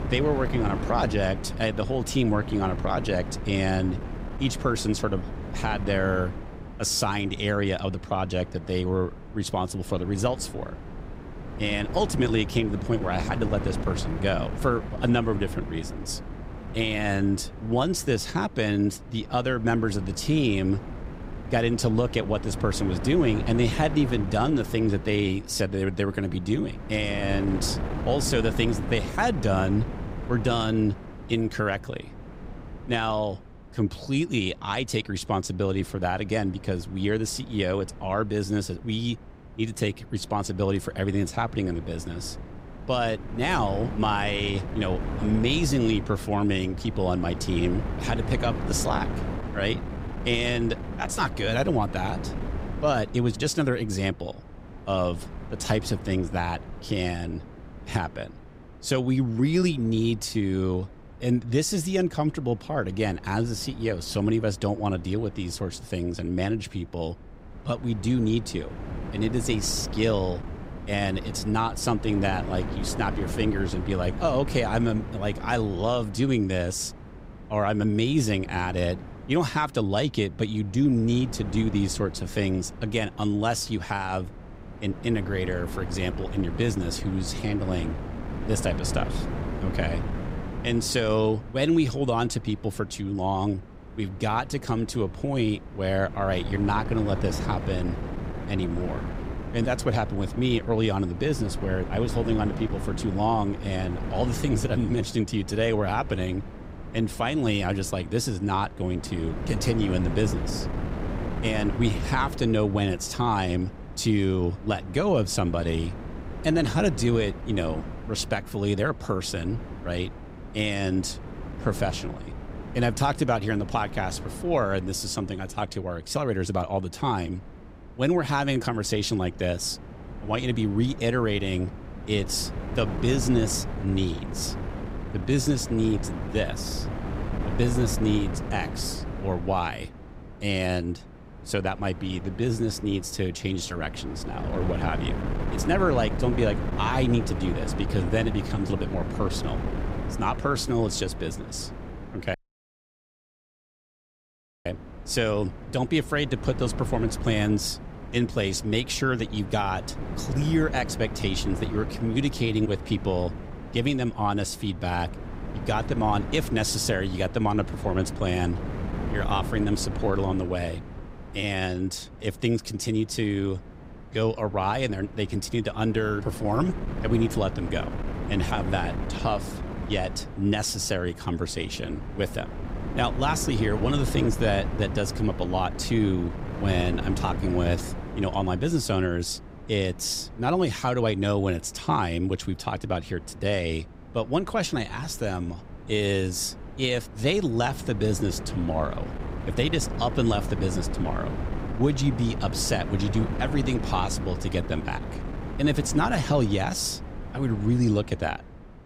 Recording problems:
wind noise on the microphone; occasional gusts; 10 dB below the speech
audio cutting out; at 2:32 for 2.5 s

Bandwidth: 15.5 kHz